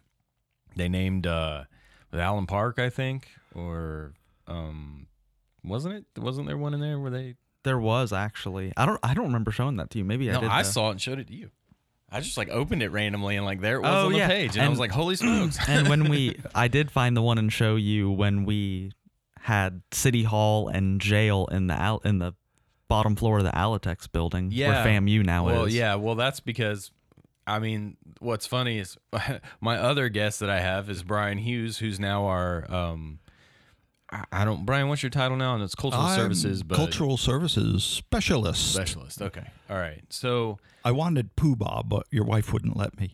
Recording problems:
none

